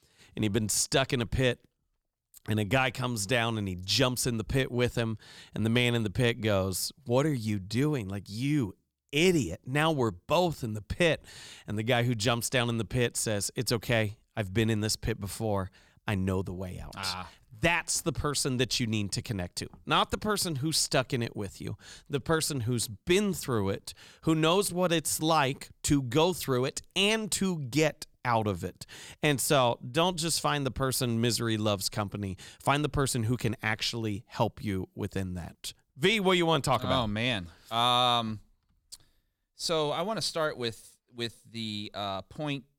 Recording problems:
none

